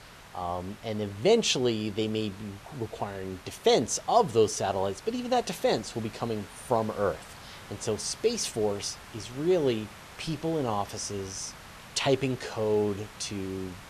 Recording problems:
hiss; noticeable; throughout; 20 dB below the speech

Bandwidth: 13.5 kHz